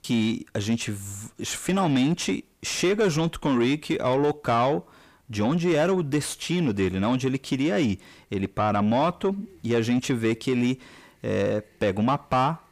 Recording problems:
distortion; slight; 10 dB below the speech

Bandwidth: 15 kHz